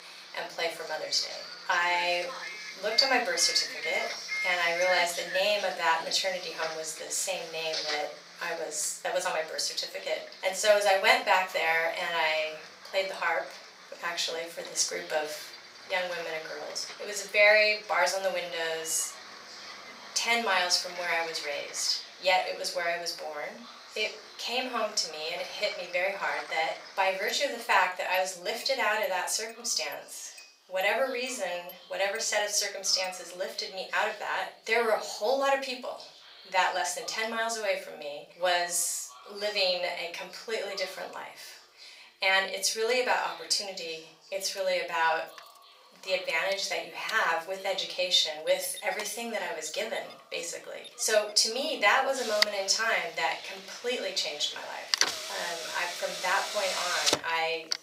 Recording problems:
off-mic speech; far
thin; very; fading below 900 Hz
room echo; slight; dies away in 0.3 s
traffic noise; loud; throughout; 9 dB below the speech
voice in the background; faint; throughout; 25 dB below the speech

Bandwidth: 15.5 kHz